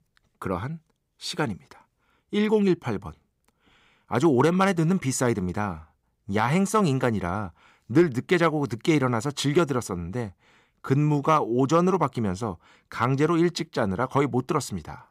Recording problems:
none

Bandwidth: 15.5 kHz